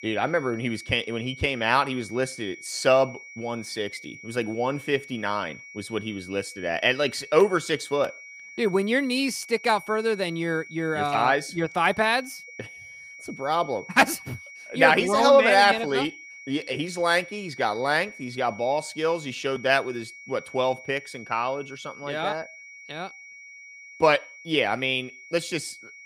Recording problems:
high-pitched whine; noticeable; throughout; 2.5 kHz, 15 dB below the speech

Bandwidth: 15 kHz